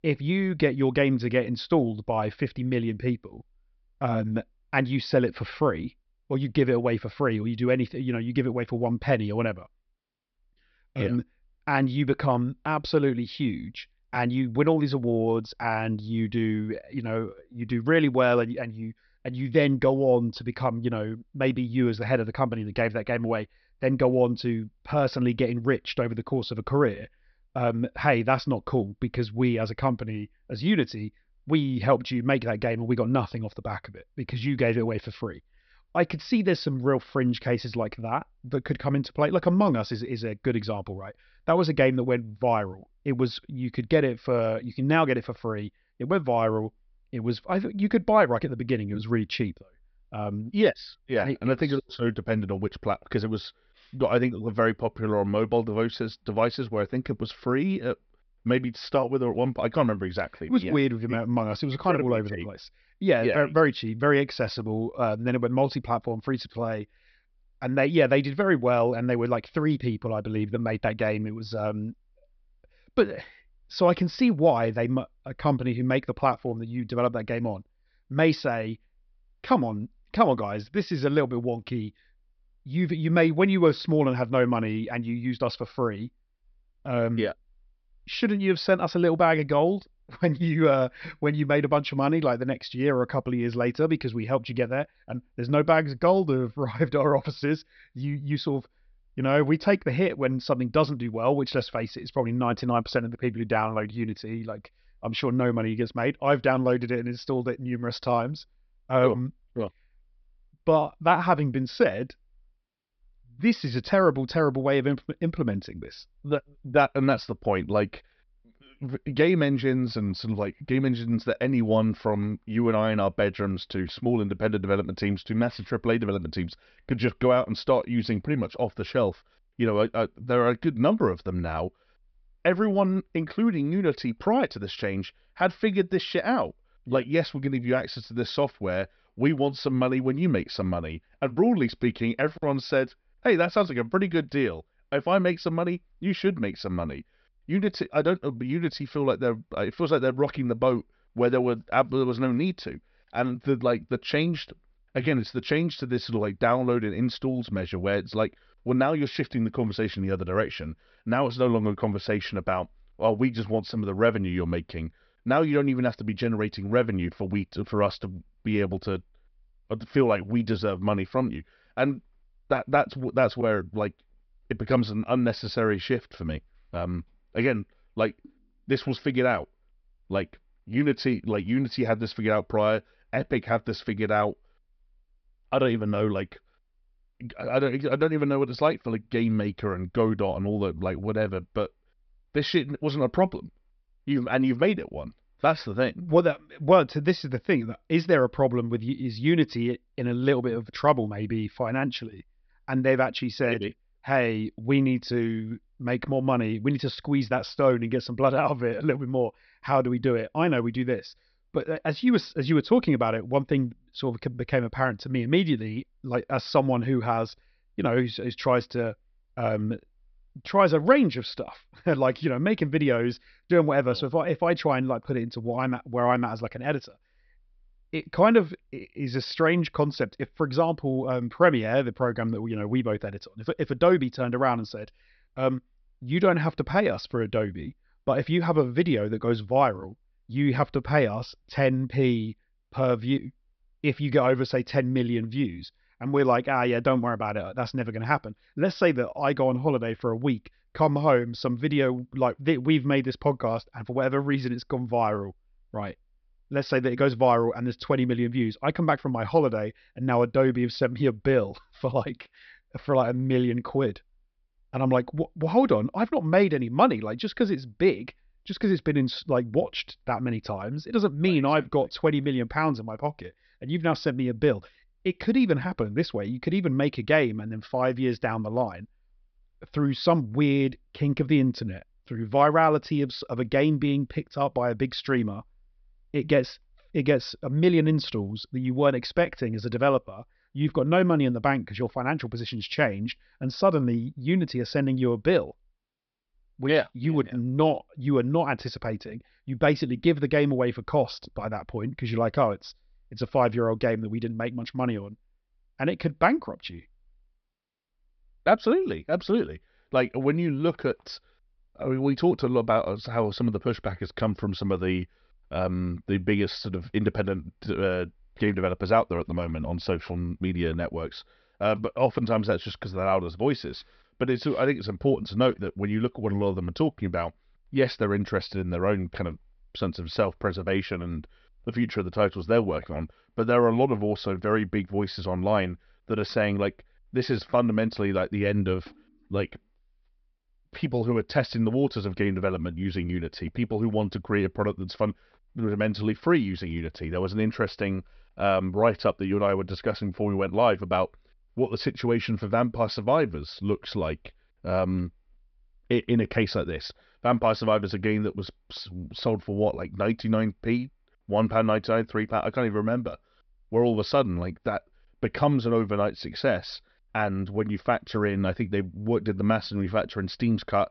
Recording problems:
high frequencies cut off; noticeable; nothing above 5.5 kHz

